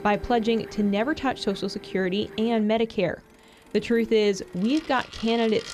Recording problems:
household noises; noticeable; throughout; 15 dB below the speech

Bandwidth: 14 kHz